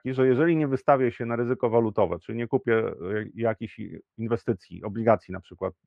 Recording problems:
muffled; very; fading above 2 kHz

